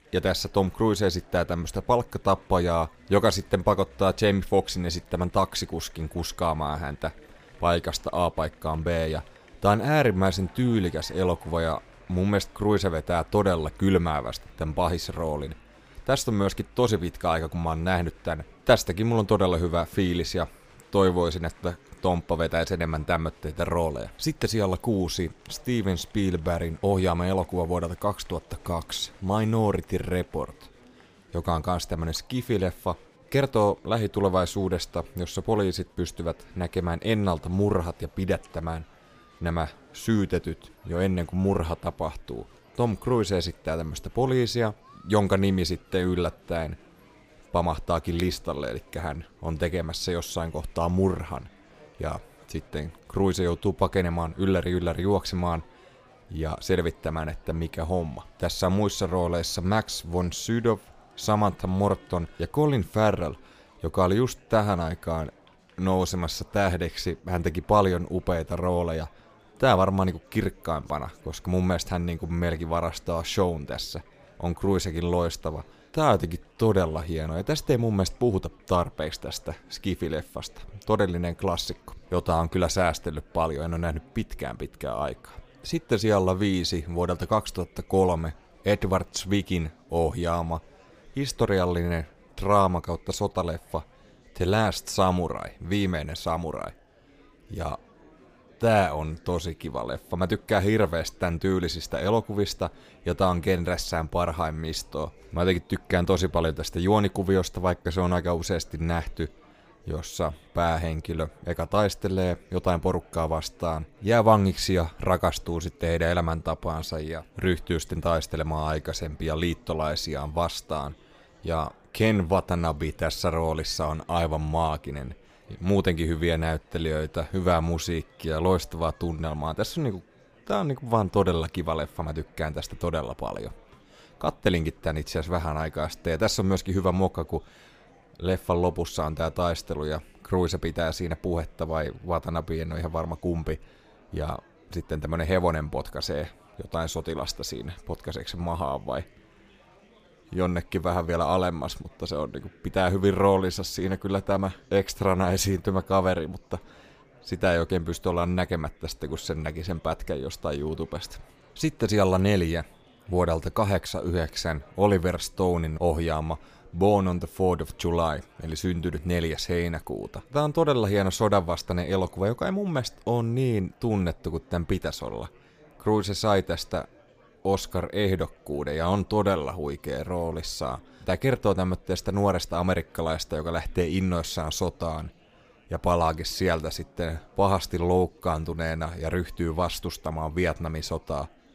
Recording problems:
chatter from many people; faint; throughout; 30 dB below the speech

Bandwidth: 15 kHz